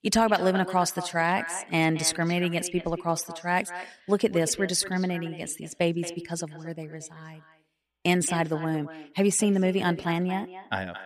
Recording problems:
echo of what is said; noticeable; throughout; 220 ms later, 15 dB below the speech

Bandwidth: 15 kHz